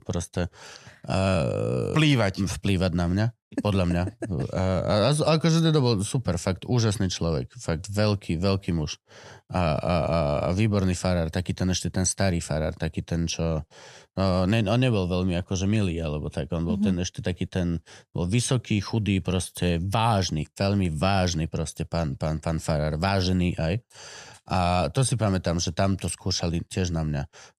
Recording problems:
none

